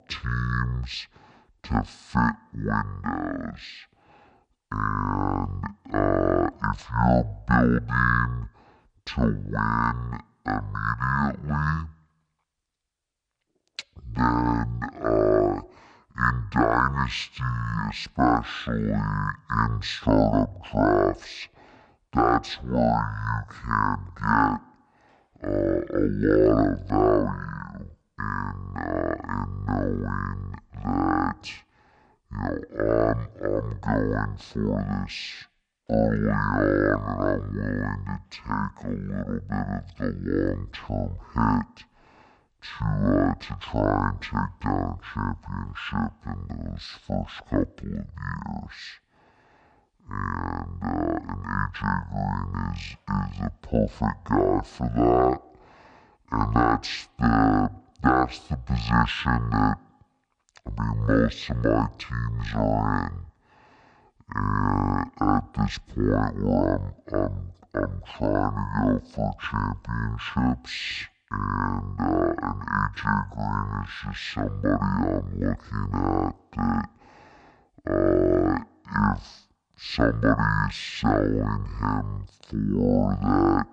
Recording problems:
wrong speed and pitch; too slow and too low; 0.5 times normal speed

